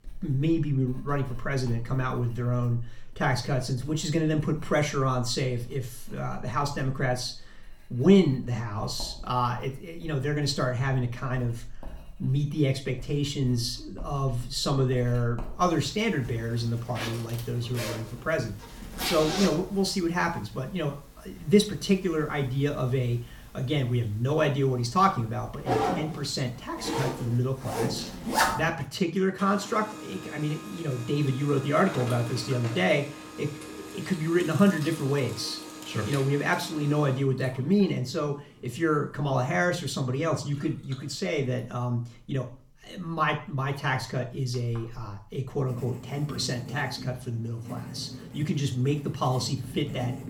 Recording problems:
room echo; very slight; dies away in 0.4 s
off-mic speech; somewhat distant
household noises; loud; throughout; 9 dB below the speech

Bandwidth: 17 kHz